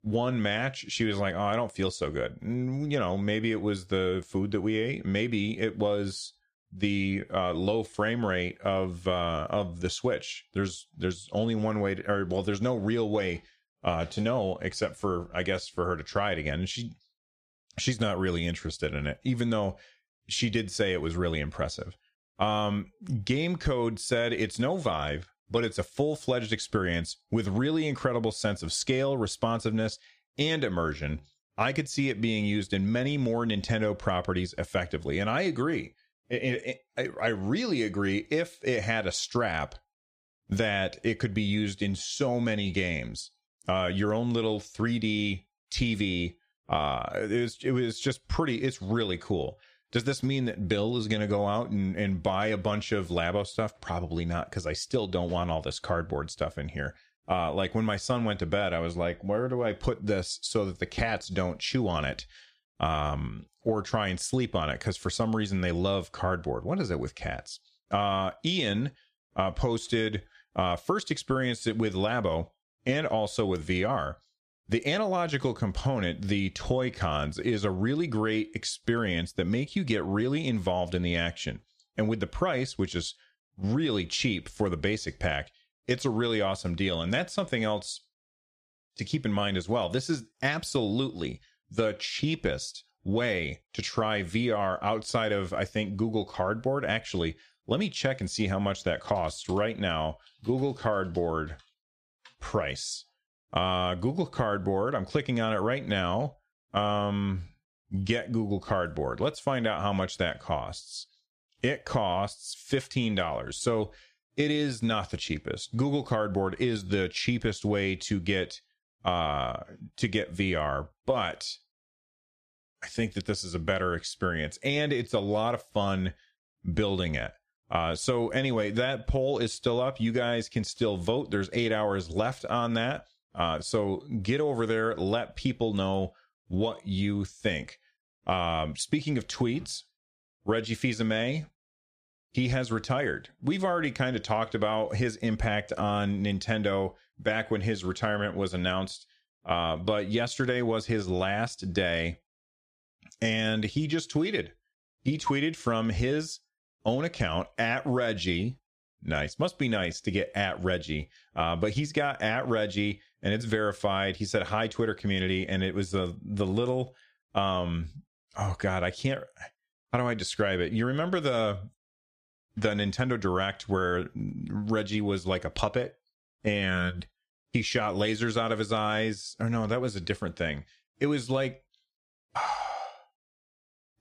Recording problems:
squashed, flat; somewhat

